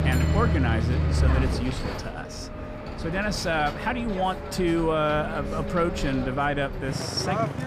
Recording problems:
traffic noise; loud; throughout; 2 dB below the speech

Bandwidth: 15 kHz